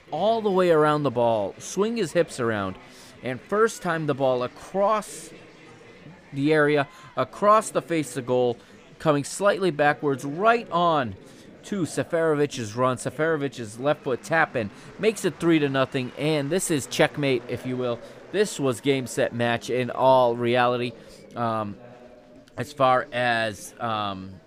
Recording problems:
chatter from many people; faint; throughout; 20 dB below the speech

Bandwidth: 15 kHz